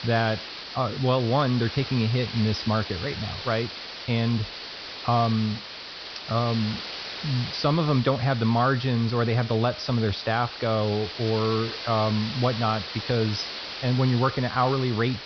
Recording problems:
high frequencies cut off; noticeable; nothing above 5.5 kHz
hiss; loud; throughout; 9 dB below the speech

